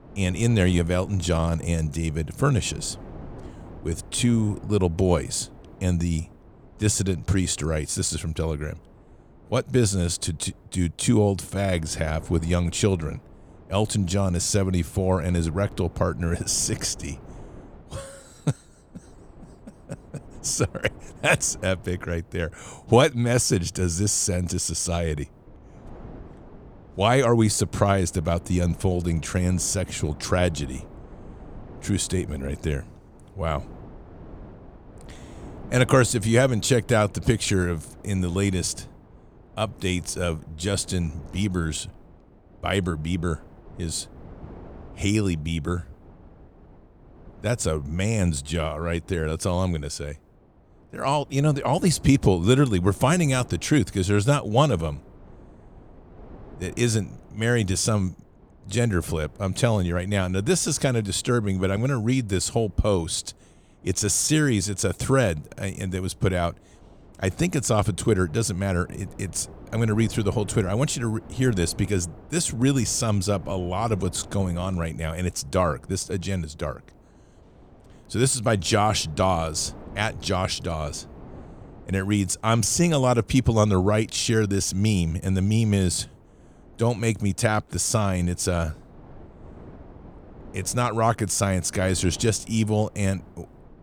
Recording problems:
wind noise on the microphone; occasional gusts; 25 dB below the speech

